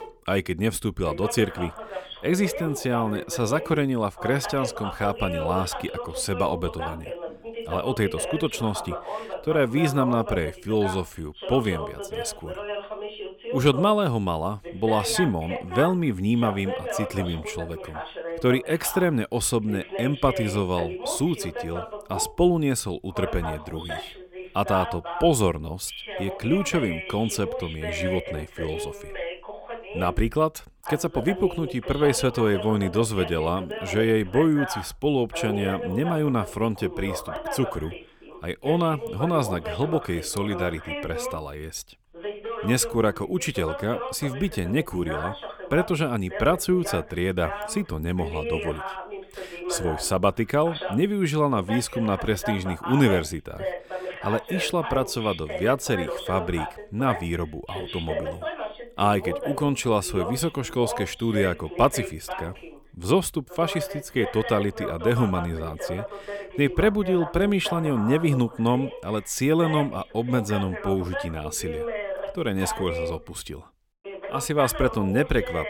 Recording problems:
voice in the background; loud; throughout; 9 dB below the speech

